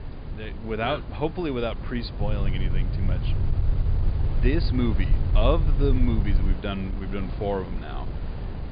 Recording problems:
high frequencies cut off; severe; nothing above 5 kHz
wind noise on the microphone; occasional gusts; 10 dB below the speech
low rumble; noticeable; from 2 to 6.5 s; 10 dB below the speech

